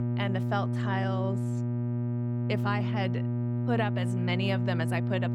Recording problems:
electrical hum; loud; throughout; 60 Hz, 5 dB below the speech

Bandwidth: 17 kHz